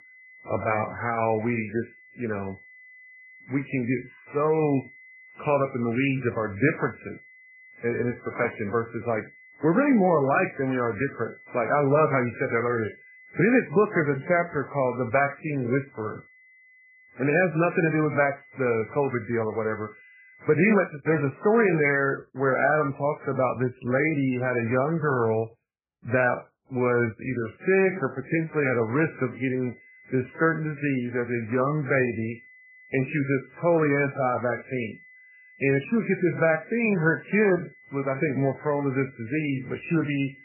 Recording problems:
garbled, watery; badly; nothing above 2.5 kHz
high-pitched whine; faint; until 21 s and from 28 s on; 2 kHz, 25 dB below the speech

